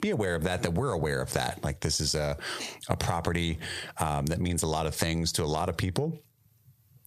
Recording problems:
squashed, flat; heavily

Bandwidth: 14.5 kHz